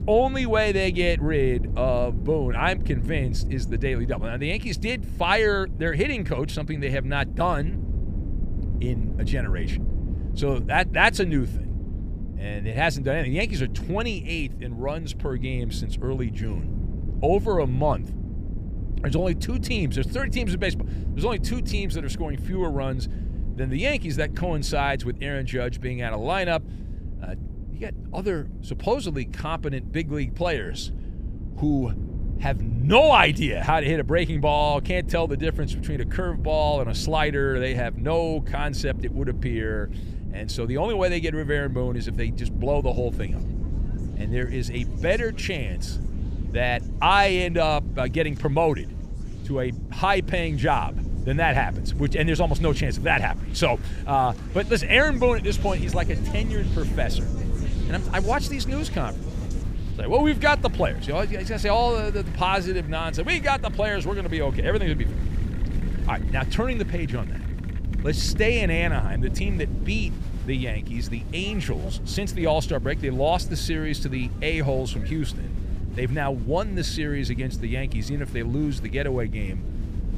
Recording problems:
wind noise on the microphone; occasional gusts; 20 dB below the speech
crowd noise; faint; throughout; 20 dB below the speech

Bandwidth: 15 kHz